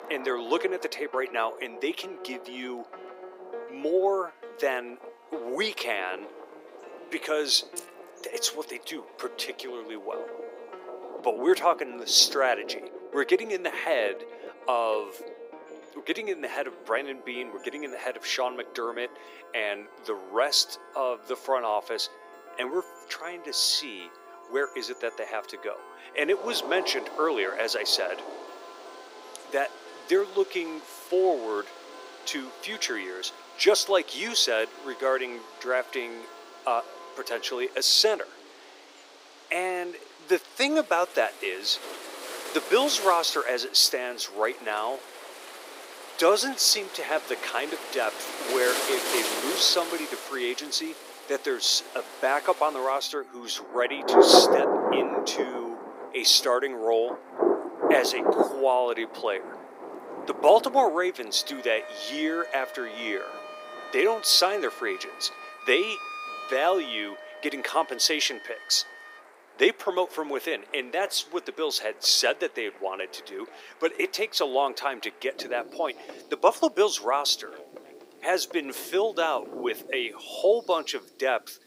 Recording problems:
thin; very; fading below 350 Hz
rain or running water; loud; throughout; 4 dB below the speech
background music; noticeable; throughout; 20 dB below the speech
jangling keys; faint; at 8 s; peak 15 dB below the speech

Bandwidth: 15.5 kHz